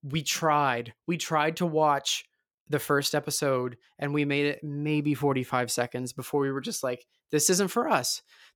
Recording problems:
none

